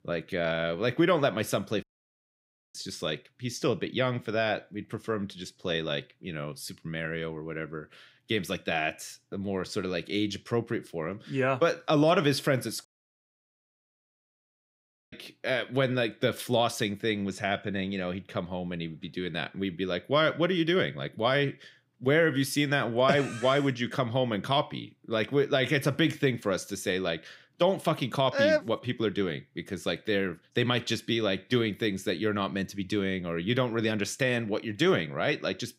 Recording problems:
audio cutting out; at 2 s for 1 s and at 13 s for 2.5 s

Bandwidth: 15.5 kHz